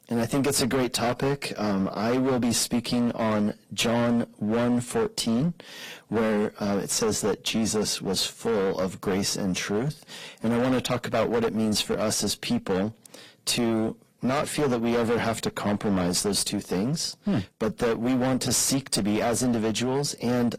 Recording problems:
distortion; heavy; 17% of the sound clipped
garbled, watery; slightly

